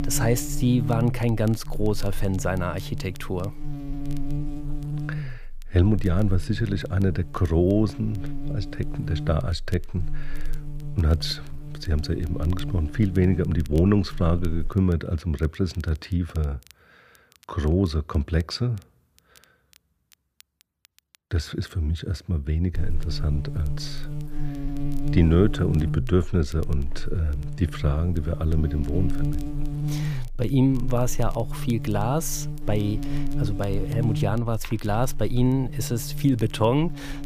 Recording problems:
crackle, like an old record; faint; 30 dB below the speech
electrical hum; very faint; until 15 s and from 23 s on; 60 Hz, 10 dB below the speech

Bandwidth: 15 kHz